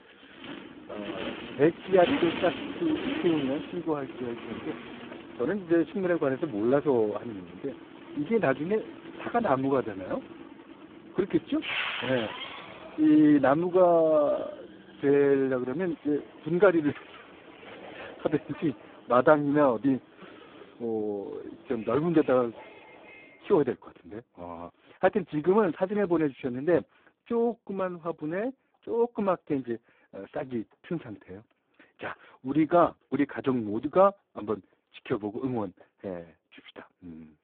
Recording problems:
phone-call audio; poor line; nothing above 3.5 kHz
traffic noise; noticeable; until 23 s; 10 dB below the speech

